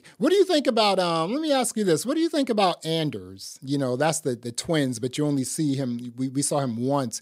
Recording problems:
none

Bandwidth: 15.5 kHz